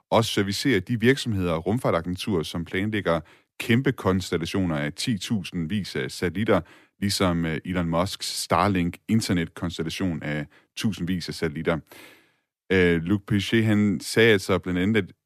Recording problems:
none

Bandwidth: 14.5 kHz